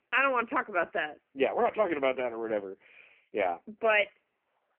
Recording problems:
phone-call audio; poor line; nothing above 3 kHz

